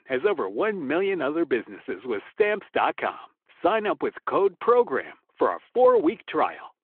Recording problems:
phone-call audio

